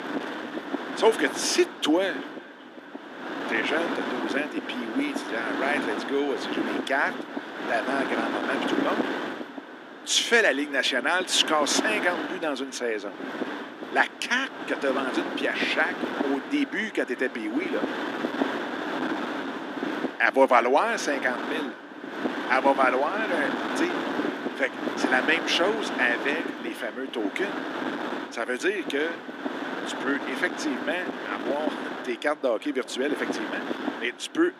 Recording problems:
thin; somewhat; fading below 250 Hz
echo of what is said; faint; throughout; 380 ms later, 20 dB below the speech
wind noise on the microphone; heavy; 6 dB below the speech

